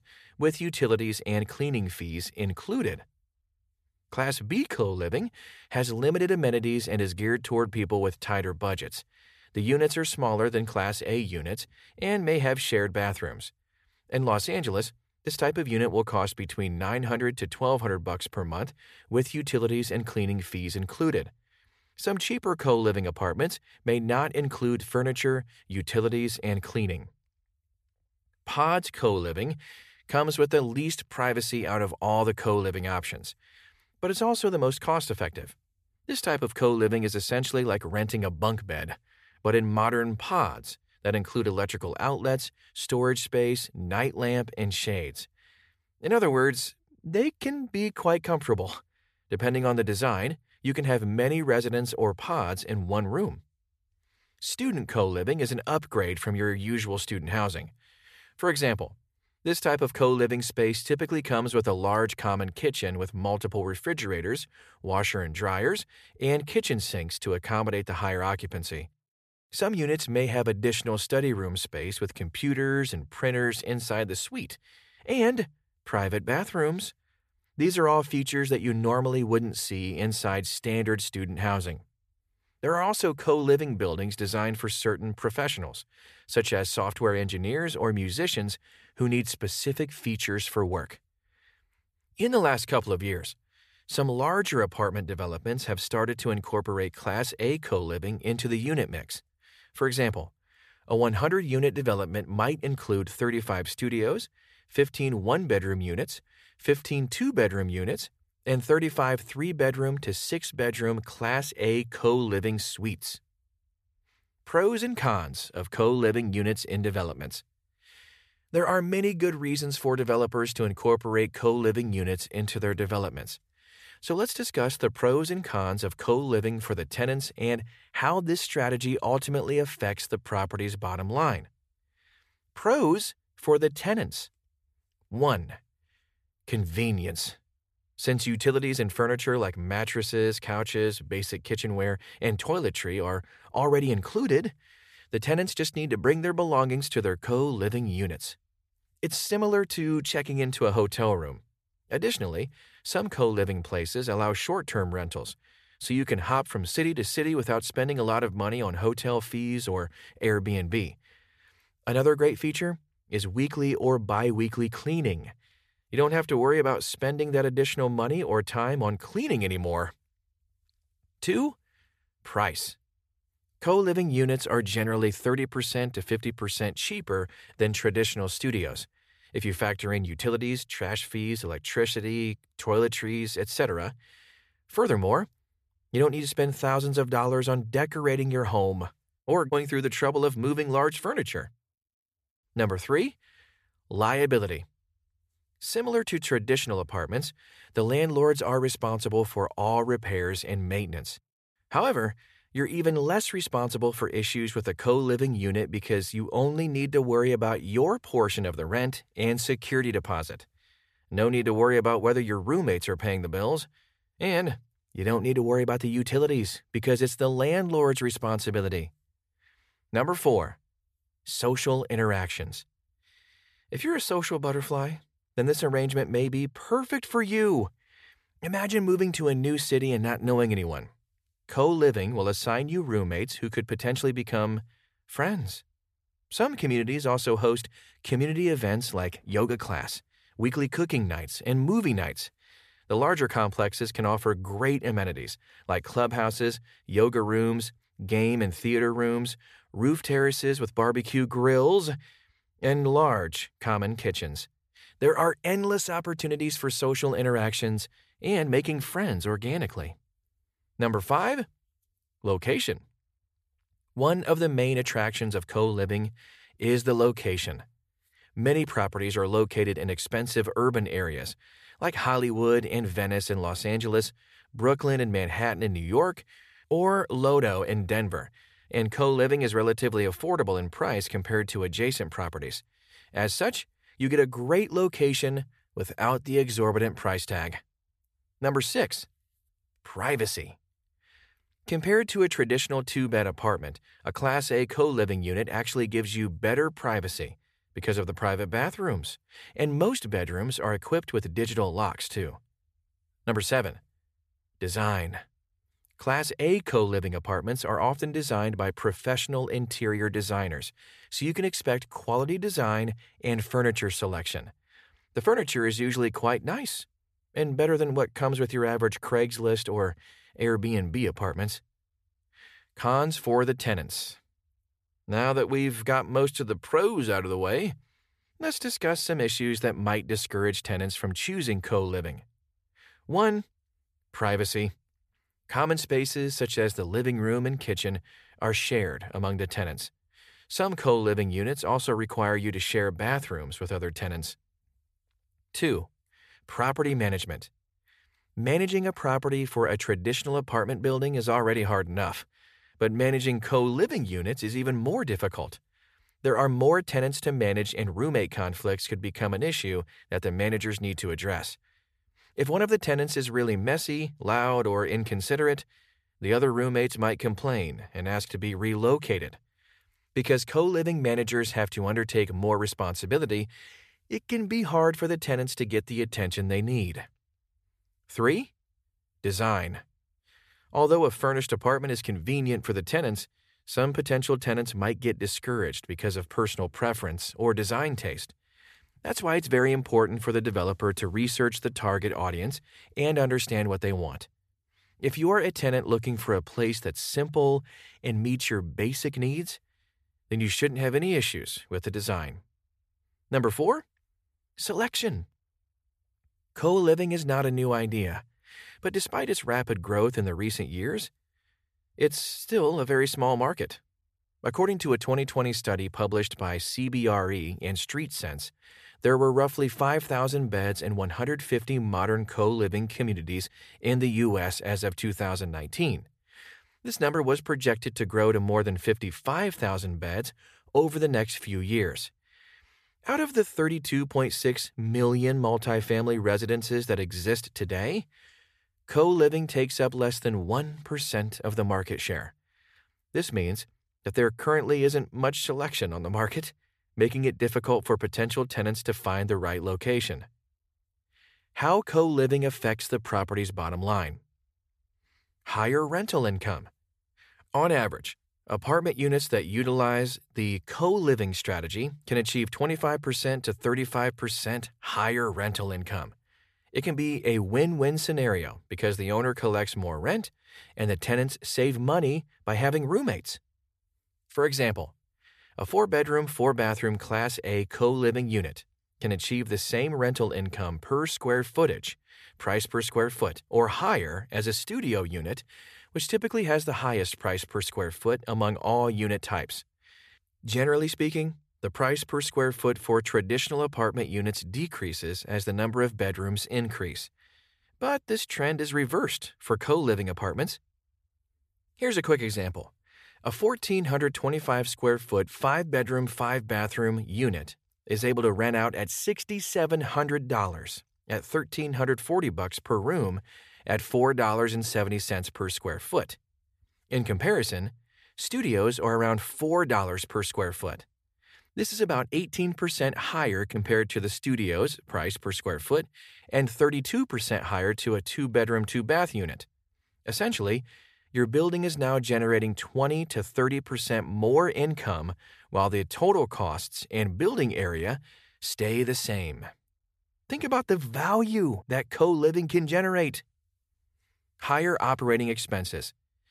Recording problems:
none

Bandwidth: 14.5 kHz